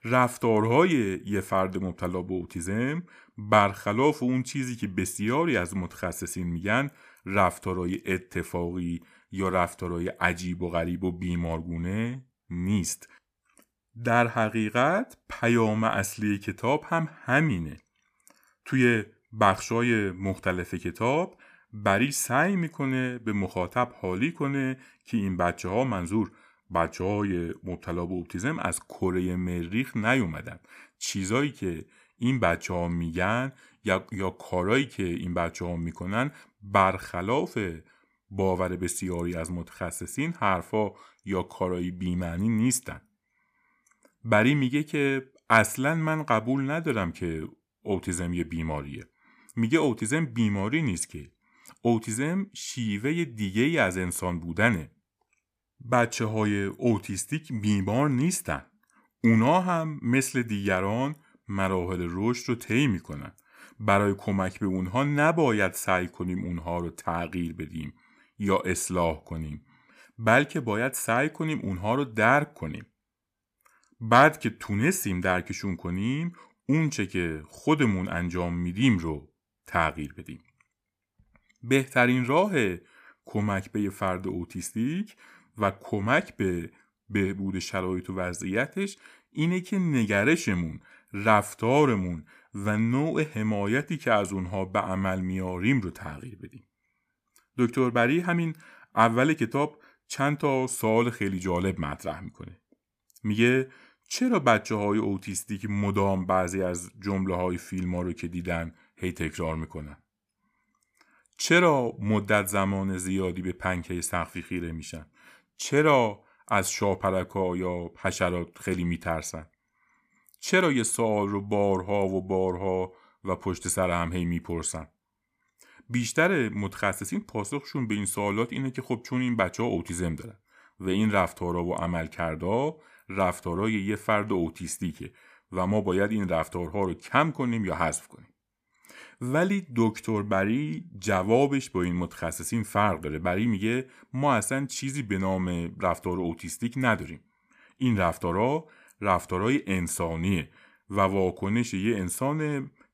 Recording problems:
none

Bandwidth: 15 kHz